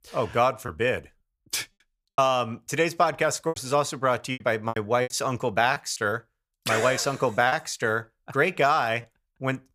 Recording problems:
choppy; very; from 0.5 to 3.5 s, from 4.5 to 6 s and at 7.5 s; 9% of the speech affected

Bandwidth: 15 kHz